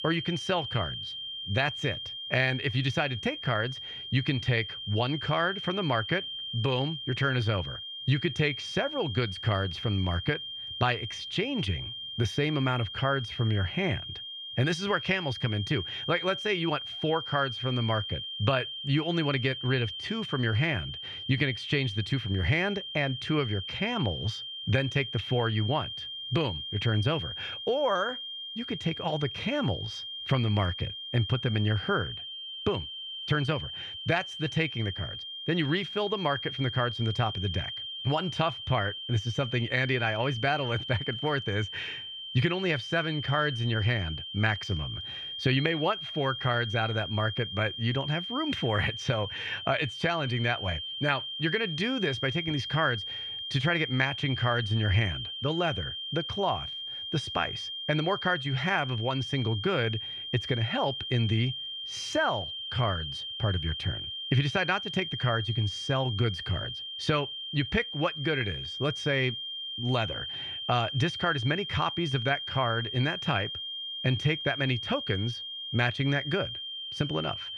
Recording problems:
muffled; slightly; fading above 3 kHz
high-pitched whine; loud; throughout; 3 kHz, 6 dB below the speech

